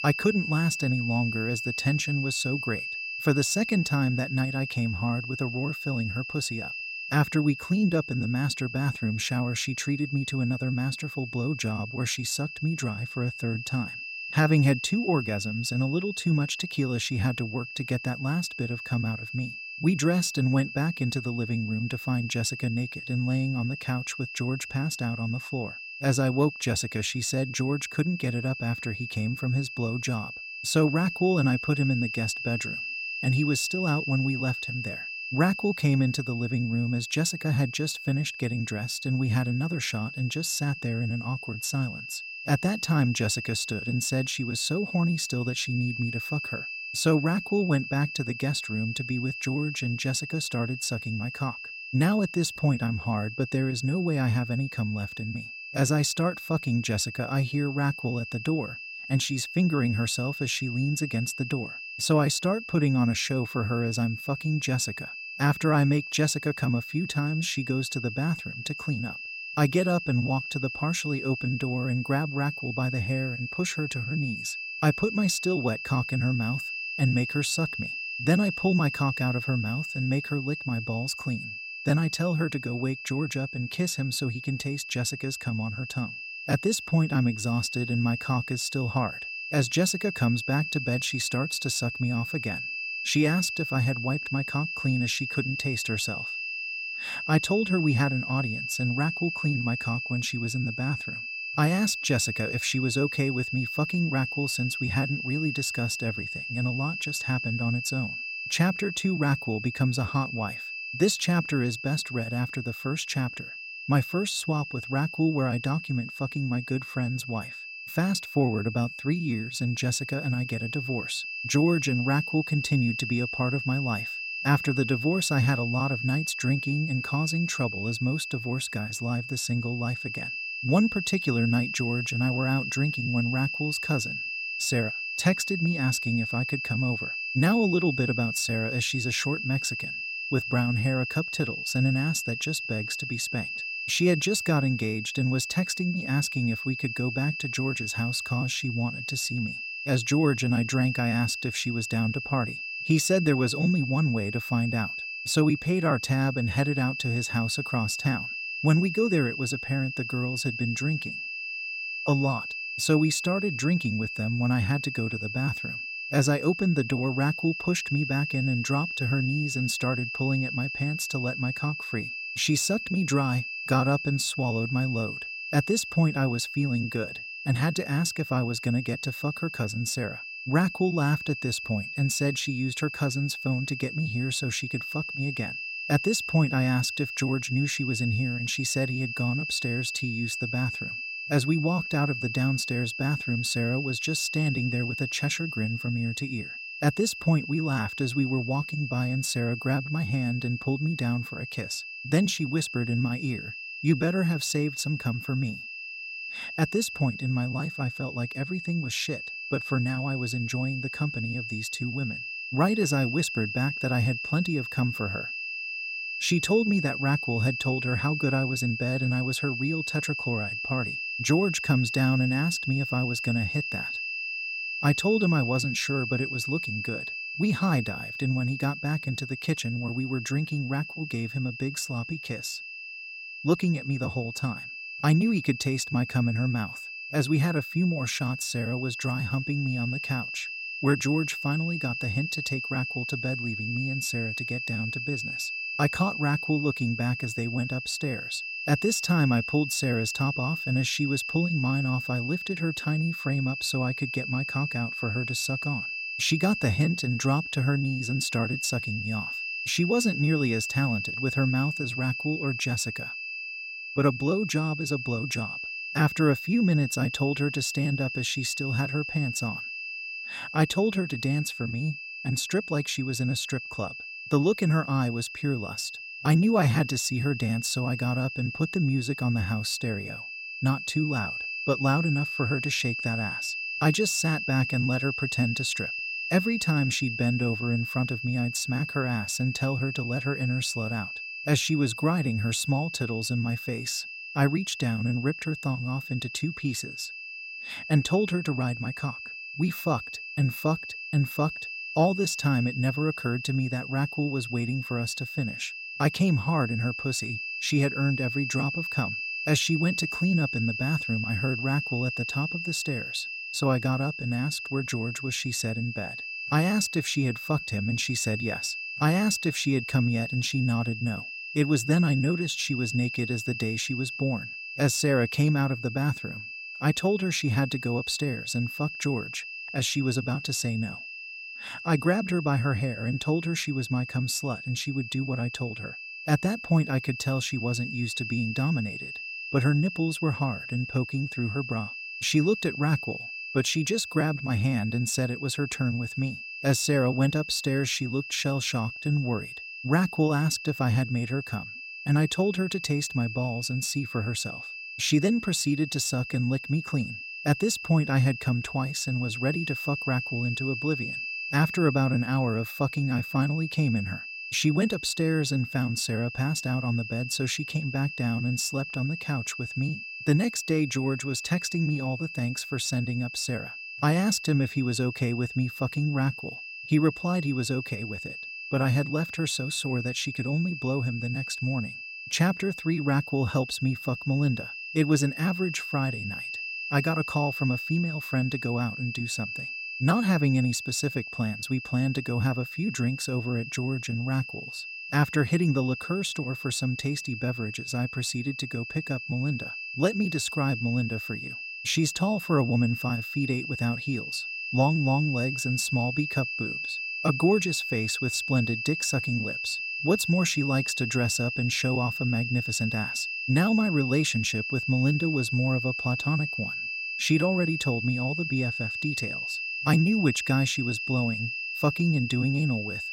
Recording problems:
high-pitched whine; loud; throughout; 2.5 kHz, 5 dB below the speech

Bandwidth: 16 kHz